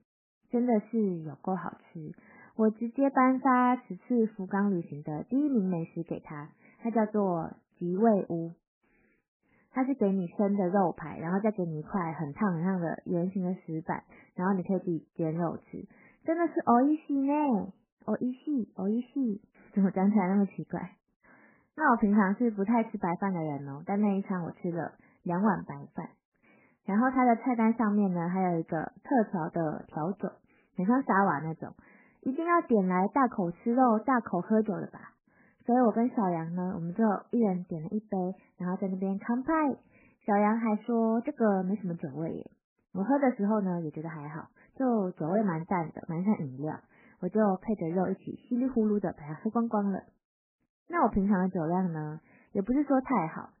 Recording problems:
garbled, watery; badly; nothing above 2.5 kHz
muffled; very slightly; fading above 2.5 kHz

